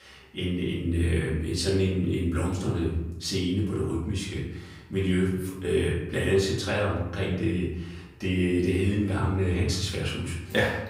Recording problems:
off-mic speech; far
room echo; noticeable; dies away in 0.8 s

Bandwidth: 15.5 kHz